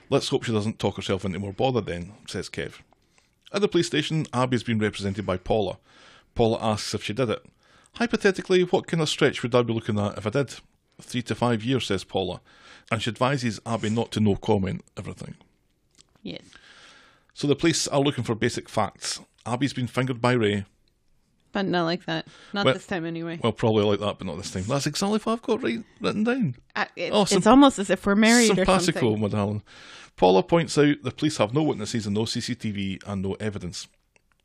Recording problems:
none

